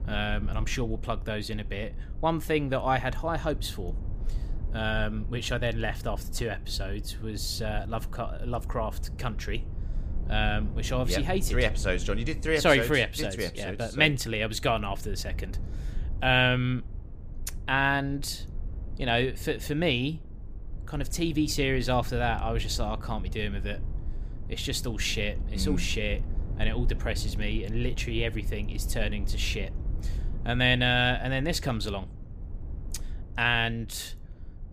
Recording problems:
low rumble; faint; throughout; 20 dB below the speech

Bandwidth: 15 kHz